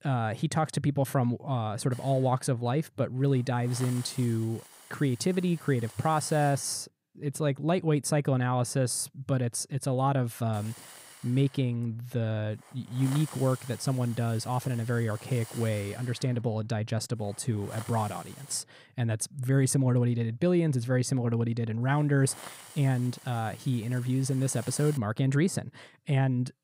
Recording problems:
hiss; noticeable; from 2 to 7 s, from 11 to 19 s and from 22 to 25 s; 20 dB below the speech

